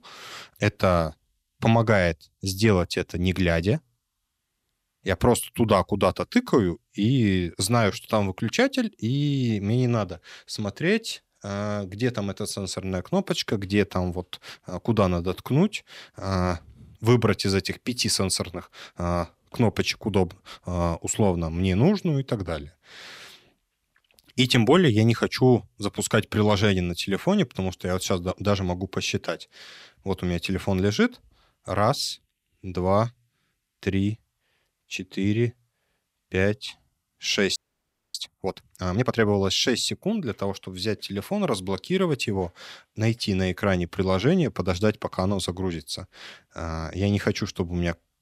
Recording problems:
audio freezing; at 38 s for 0.5 s

